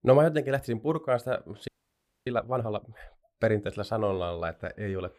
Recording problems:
audio freezing; at 1.5 s for 0.5 s

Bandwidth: 15 kHz